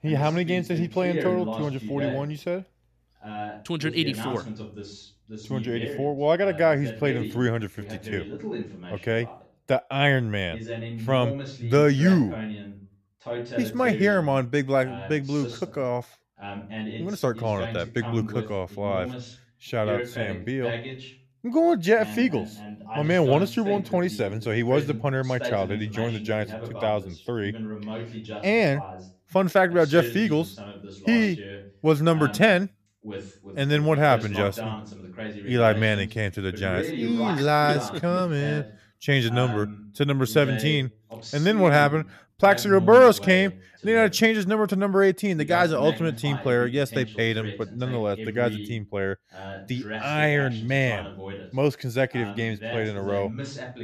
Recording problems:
voice in the background; noticeable; throughout; 10 dB below the speech

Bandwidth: 14.5 kHz